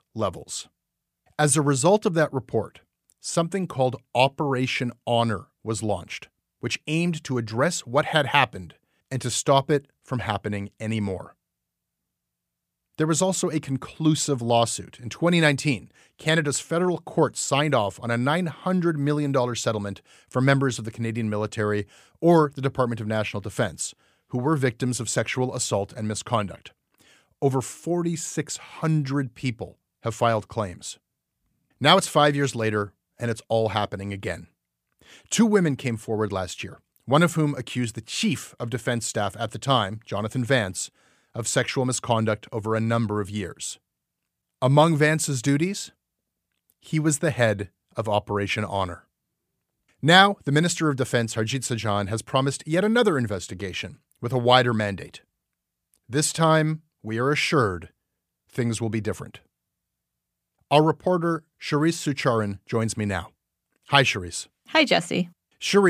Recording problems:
abrupt cut into speech; at the end

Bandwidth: 15 kHz